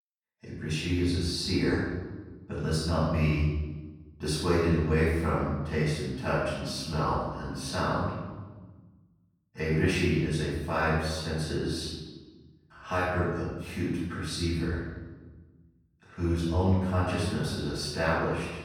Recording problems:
room echo; strong; dies away in 1.1 s
off-mic speech; far

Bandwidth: 18 kHz